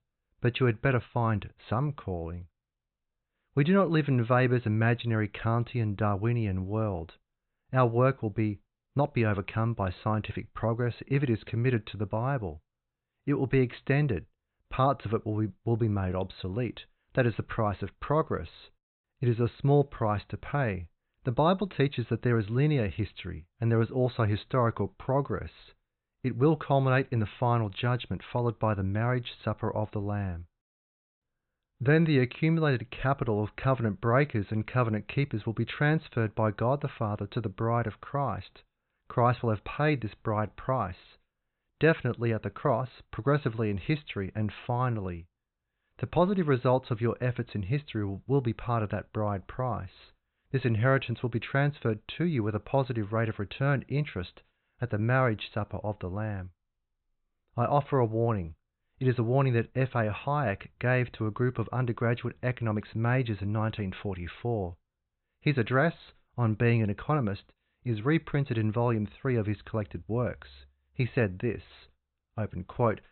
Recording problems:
high frequencies cut off; severe; nothing above 4 kHz

